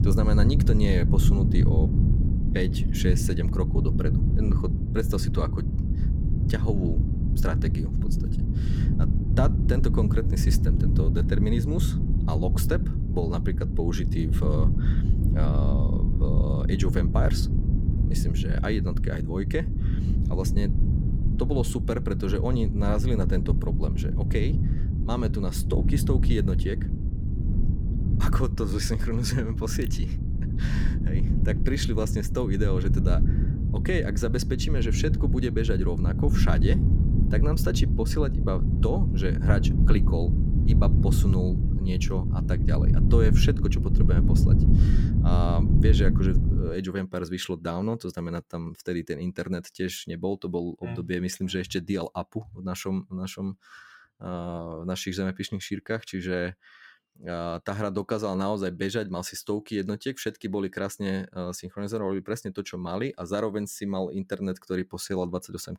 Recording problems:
wind noise on the microphone; heavy; until 47 s; 4 dB below the speech

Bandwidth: 17 kHz